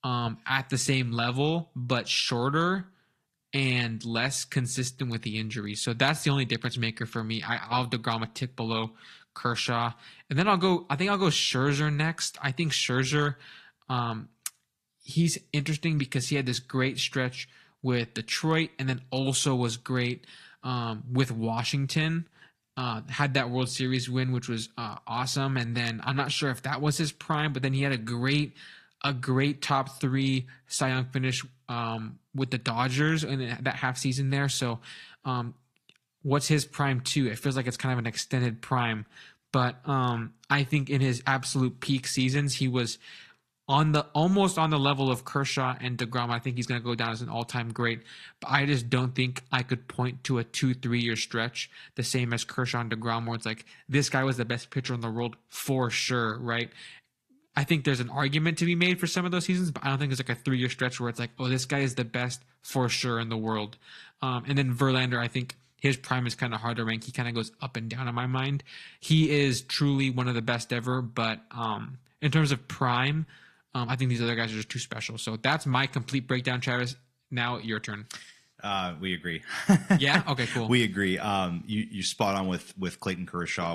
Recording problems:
garbled, watery; slightly
abrupt cut into speech; at the end

